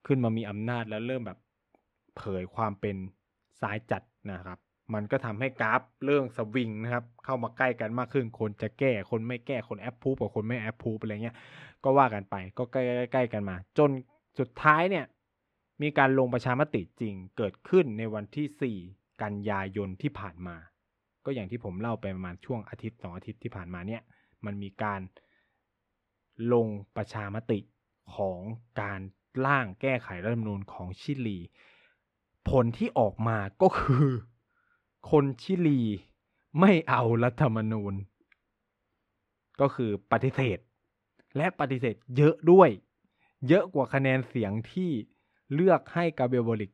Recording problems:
muffled; slightly; fading above 3 kHz

